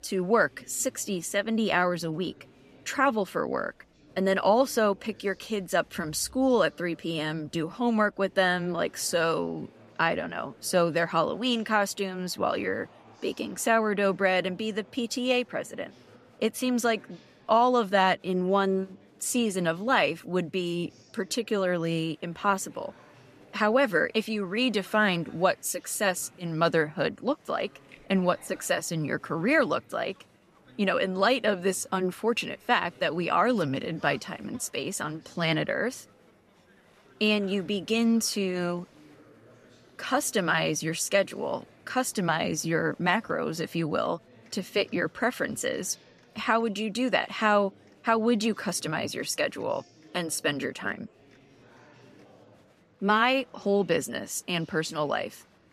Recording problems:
murmuring crowd; faint; throughout; 30 dB below the speech

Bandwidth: 14.5 kHz